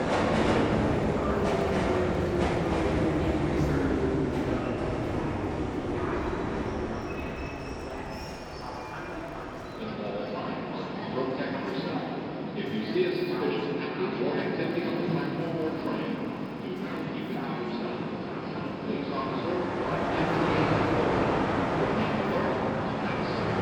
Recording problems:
room echo; strong; dies away in 3 s
off-mic speech; far
train or aircraft noise; very loud; throughout; 10 dB above the speech
background chatter; noticeable; throughout; 4 voices, 15 dB below the speech
crackling; faint; 4 times, first at 1 s; 25 dB below the speech

